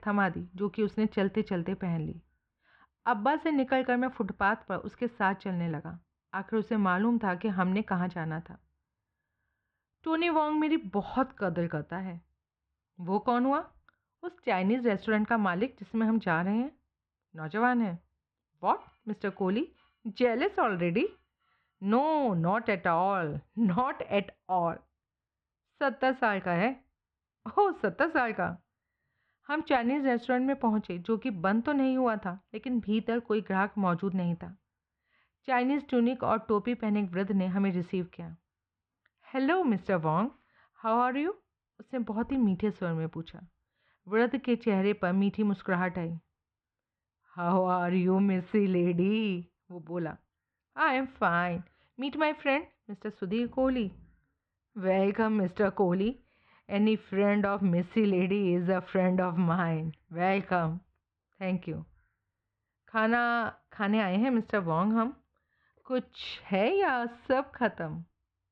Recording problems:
muffled; very; fading above 3 kHz

